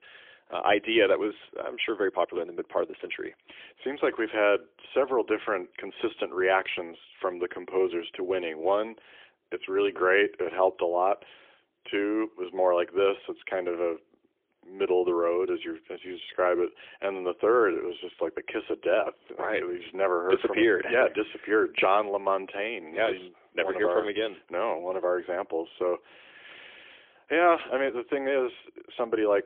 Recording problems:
phone-call audio; poor line; nothing above 3.5 kHz

